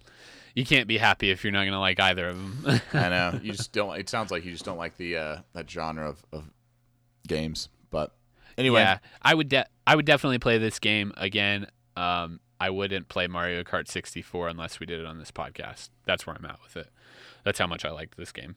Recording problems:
none

